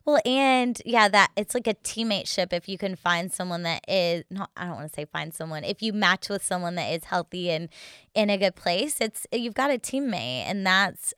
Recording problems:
none

